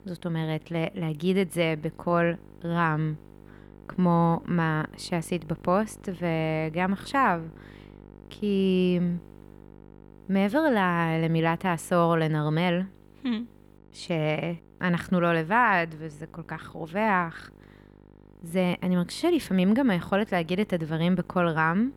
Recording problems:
electrical hum; faint; throughout; 50 Hz, 30 dB below the speech

